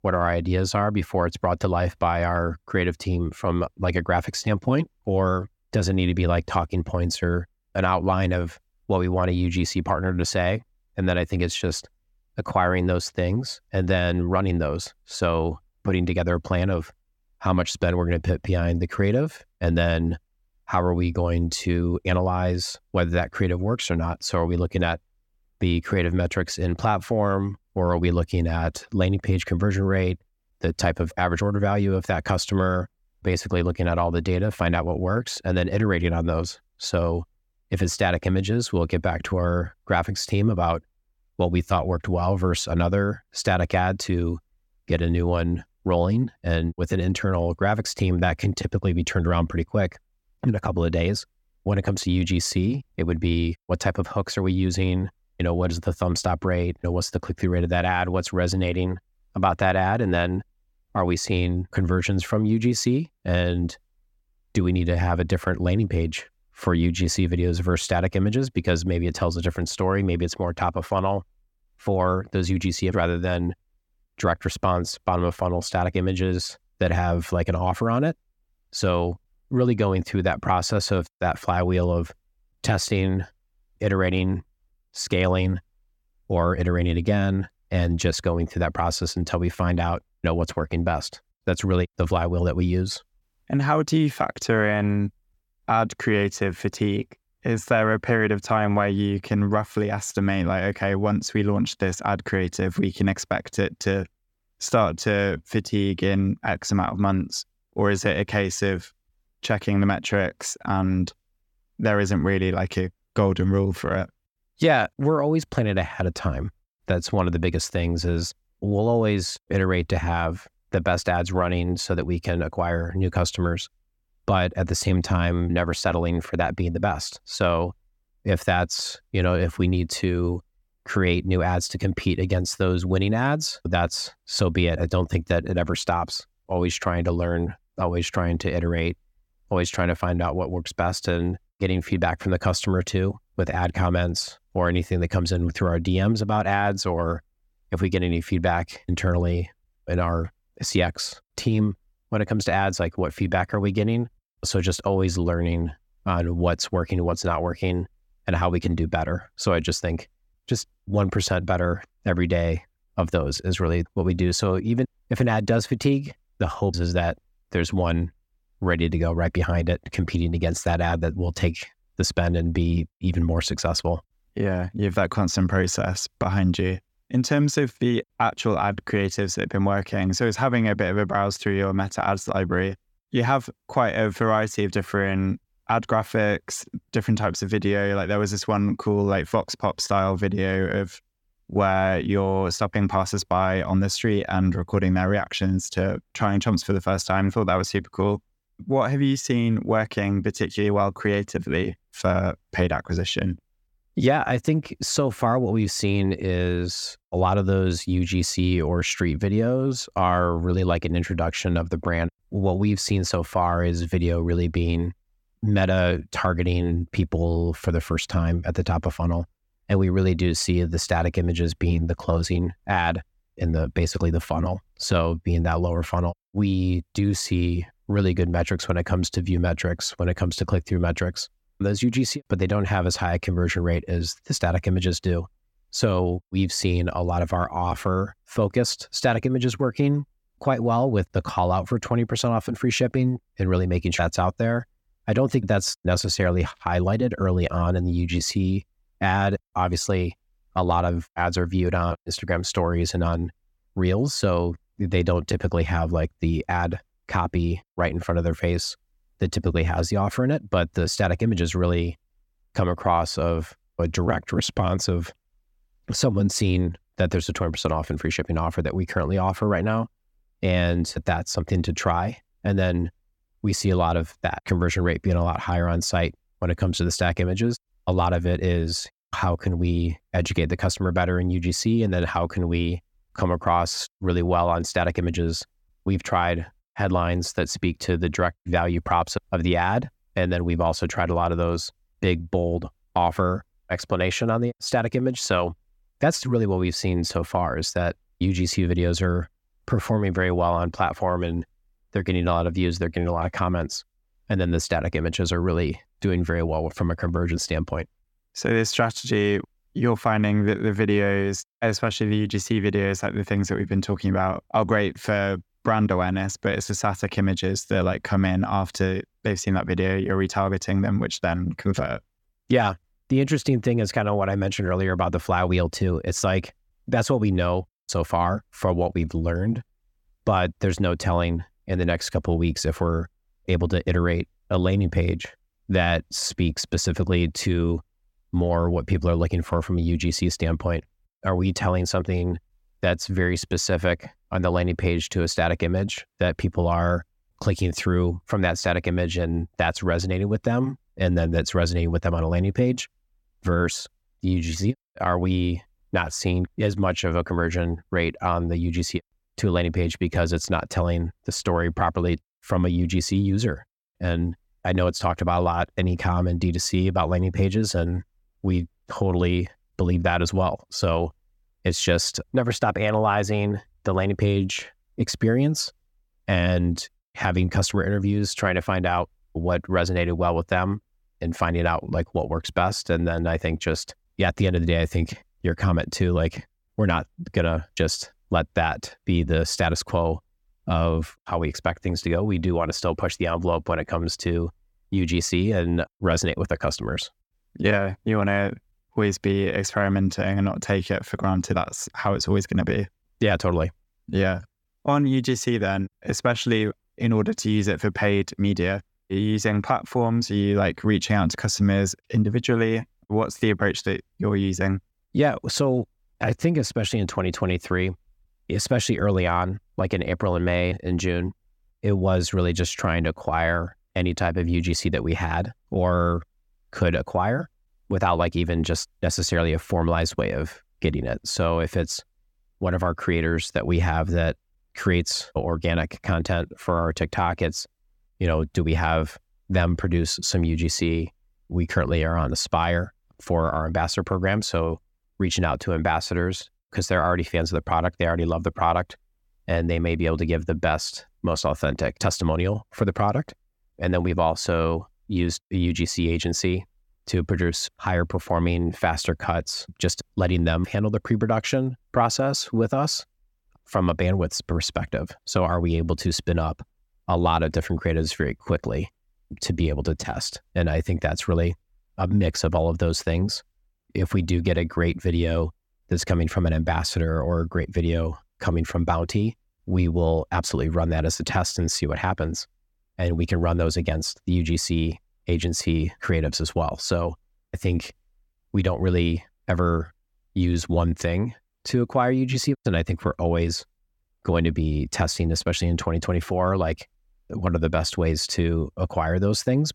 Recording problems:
none

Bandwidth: 17 kHz